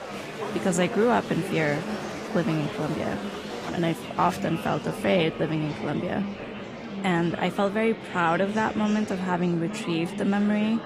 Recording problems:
garbled, watery; slightly; nothing above 14.5 kHz
murmuring crowd; loud; throughout; 8 dB below the speech

